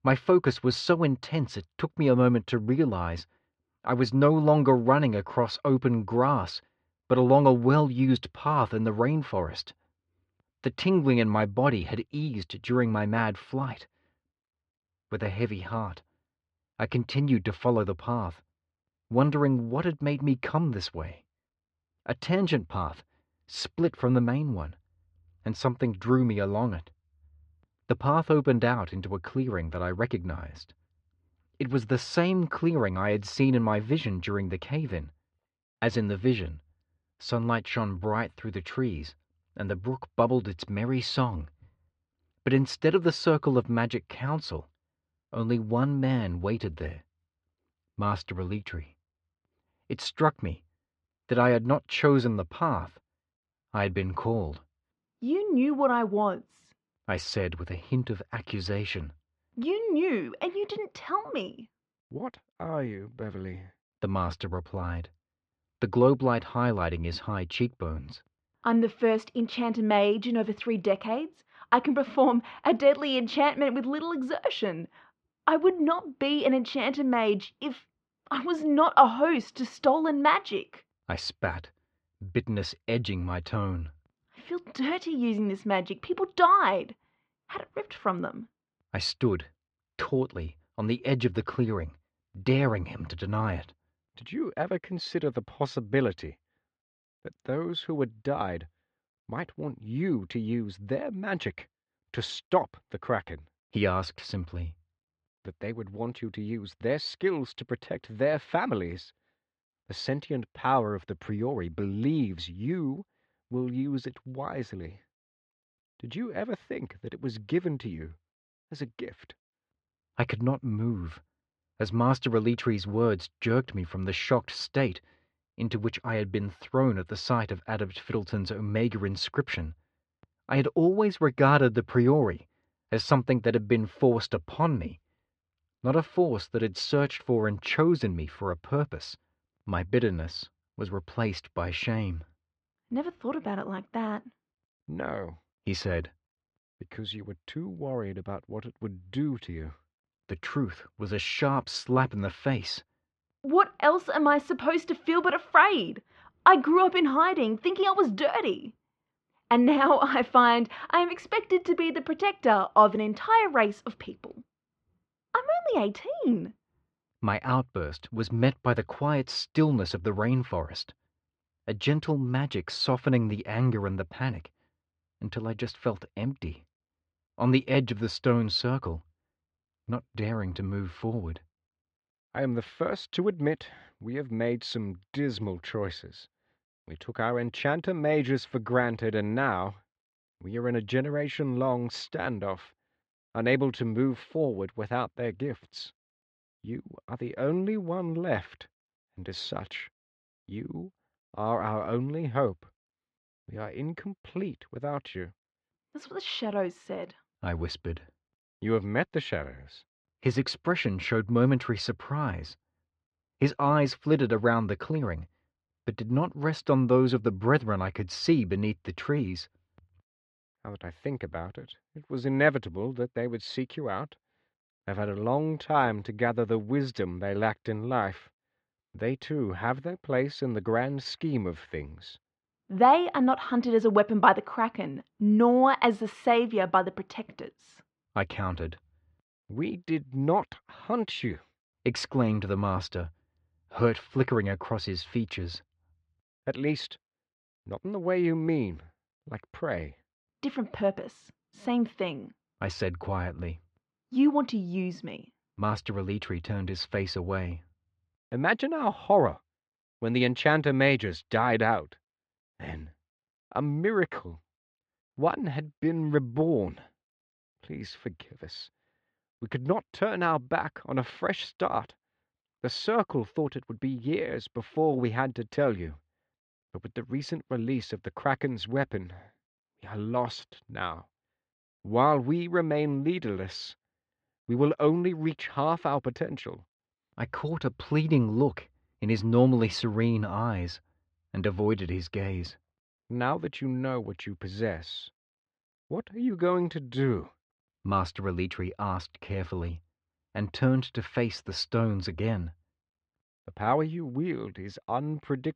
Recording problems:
muffled; slightly; fading above 3 kHz

